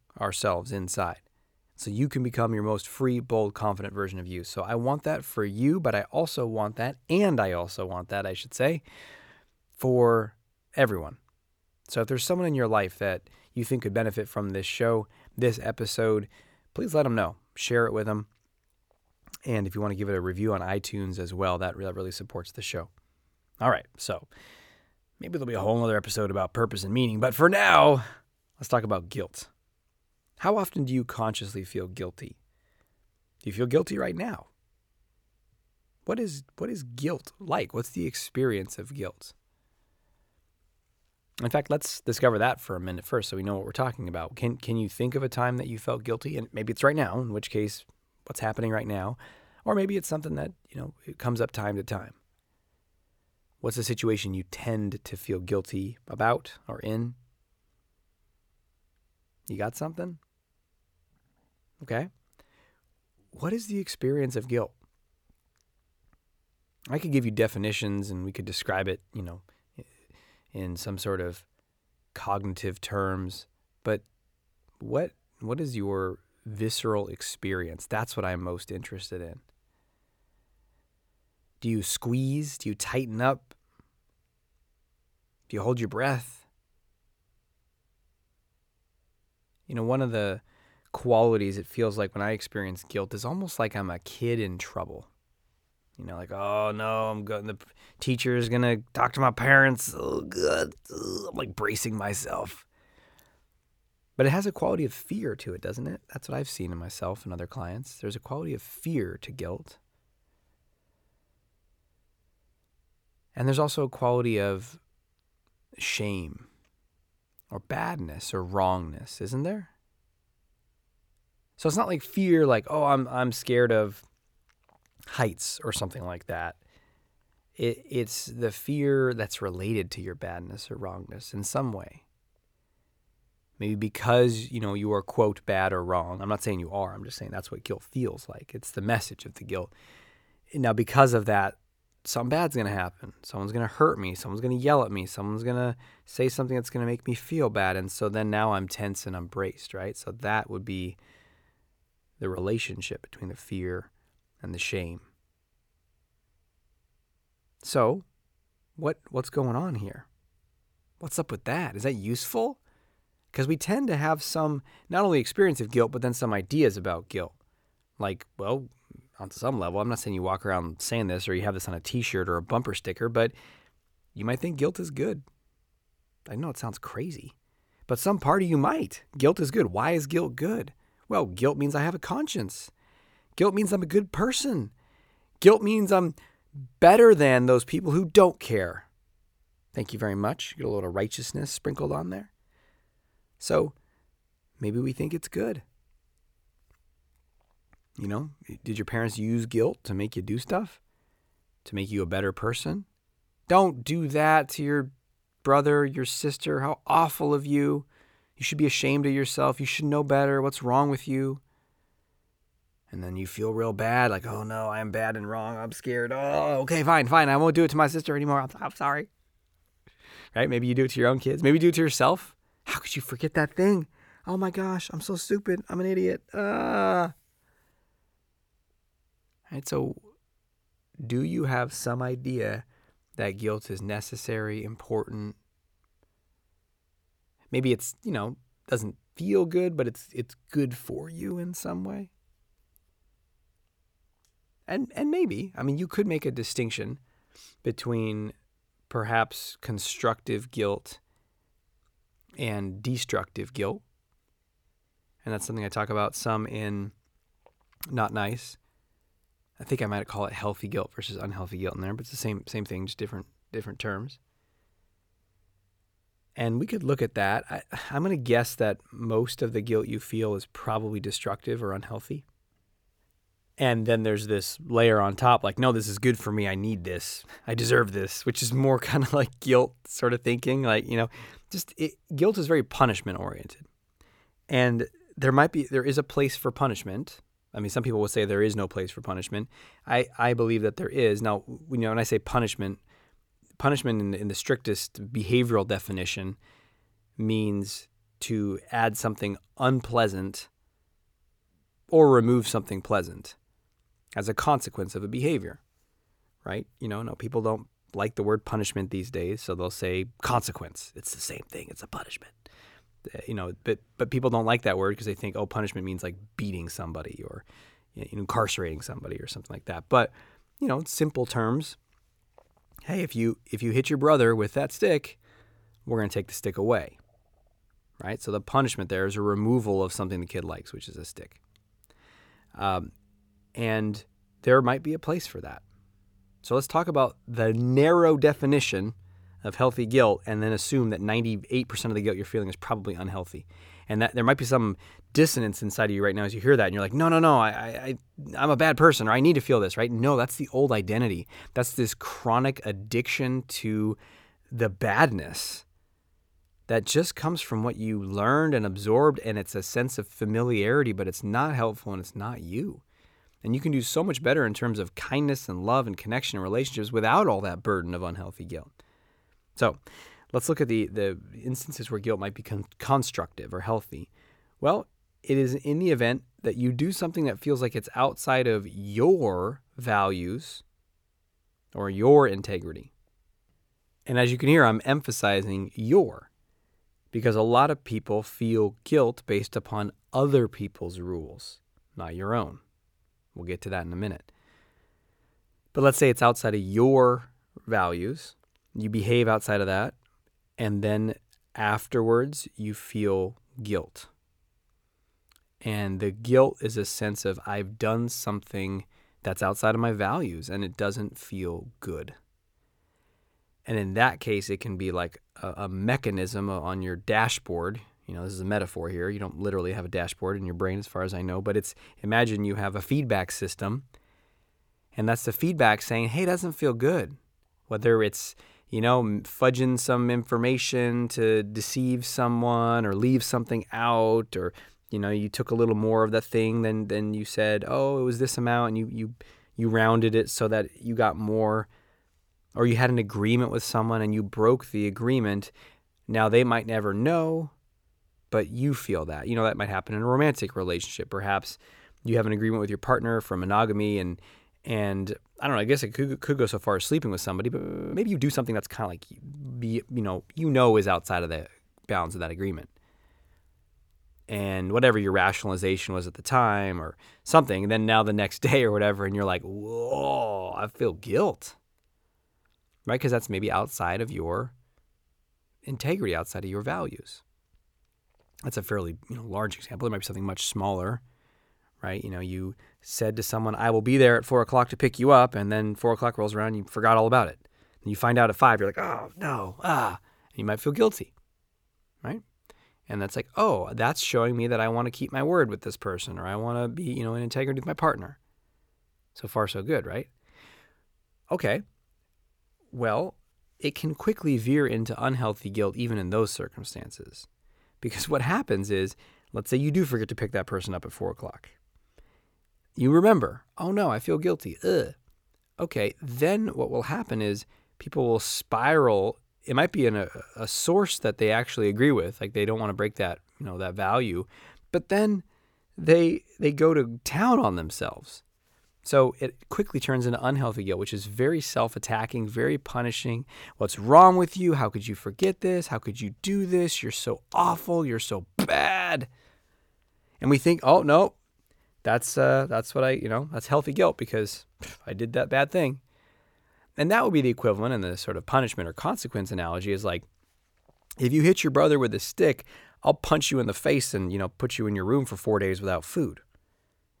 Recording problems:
audio freezing; at 7:38

